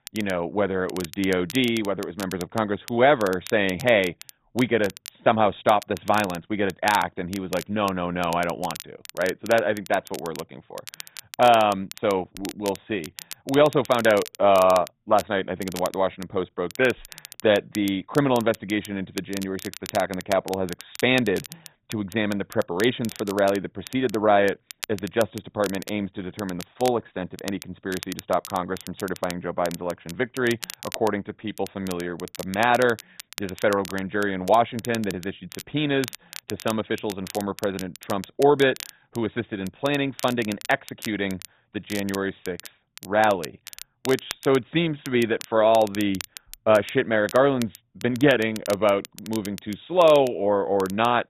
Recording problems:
garbled, watery; badly
high frequencies cut off; severe; nothing above 4 kHz
crackle, like an old record; noticeable; 15 dB below the speech

